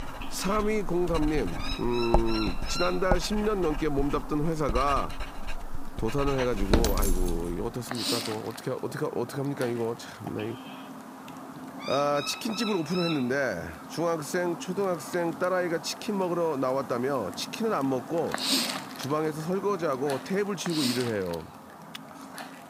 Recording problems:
animal sounds; loud; throughout; 8 dB below the speech
household noises; loud; until 7.5 s; 5 dB below the speech

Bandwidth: 15.5 kHz